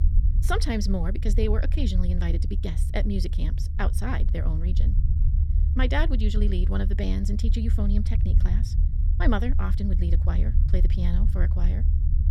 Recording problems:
wrong speed, natural pitch; too fast; 1.5 times normal speed
low rumble; loud; throughout; 10 dB below the speech

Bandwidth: 17.5 kHz